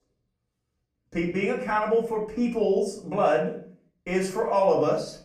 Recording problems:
off-mic speech; far
room echo; slight; dies away in 0.4 s

